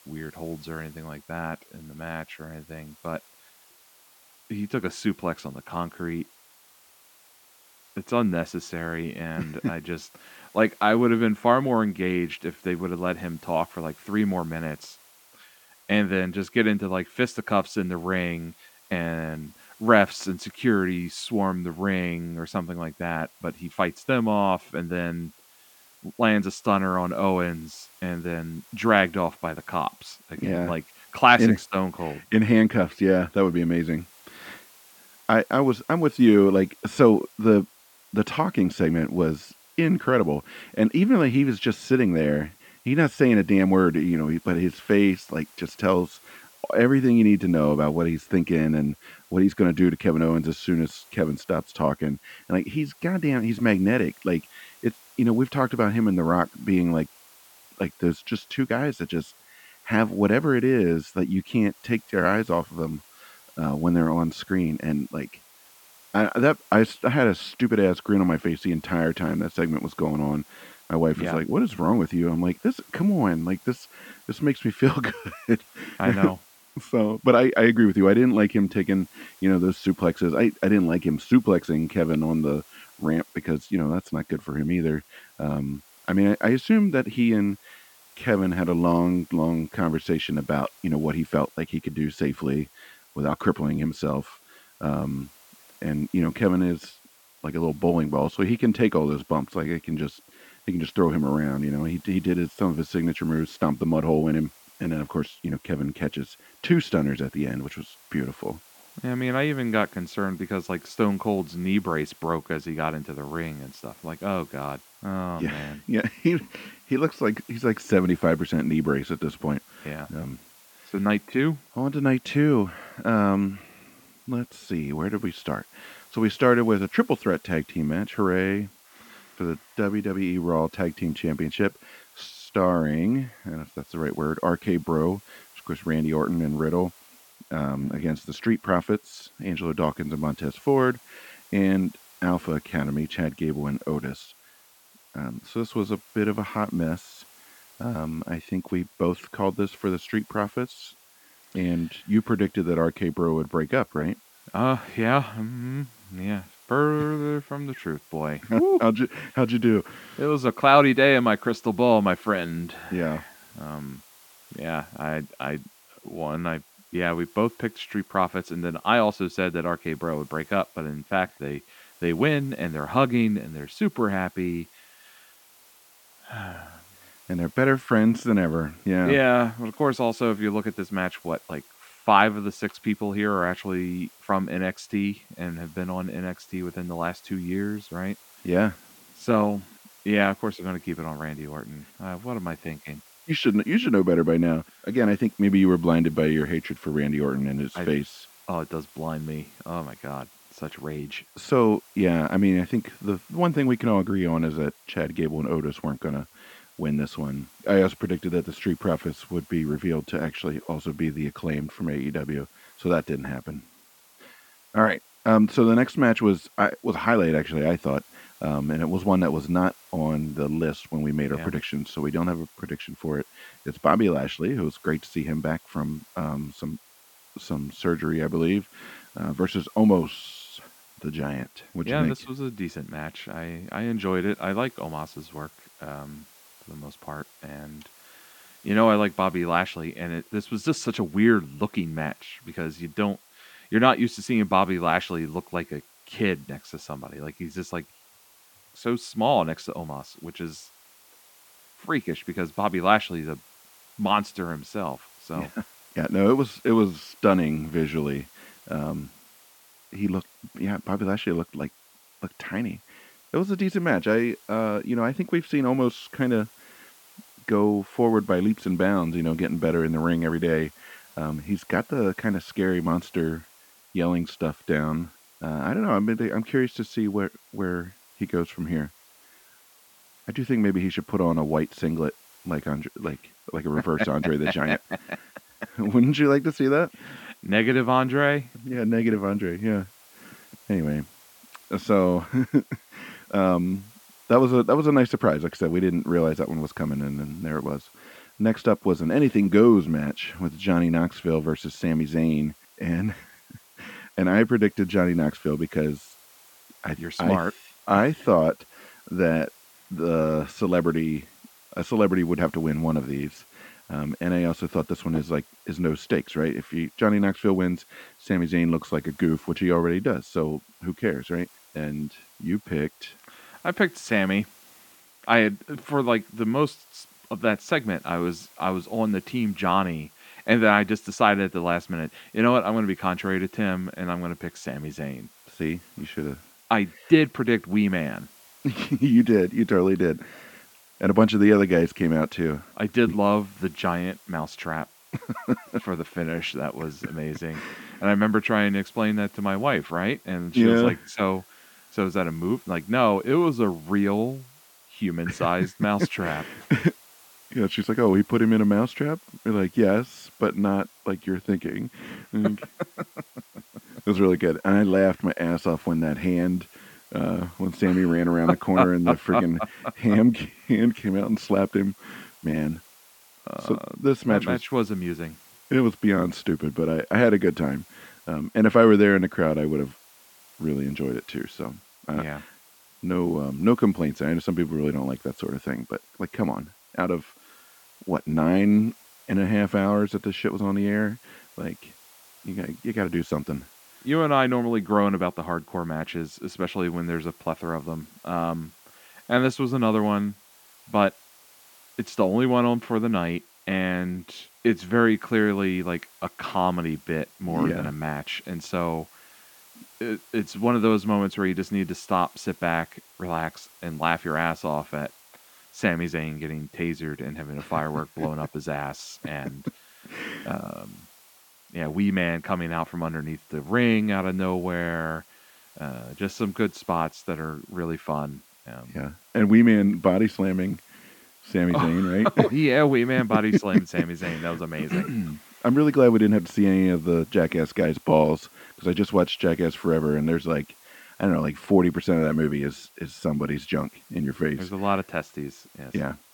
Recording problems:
muffled; slightly; fading above 3.5 kHz
hiss; faint; throughout; 25 dB below the speech

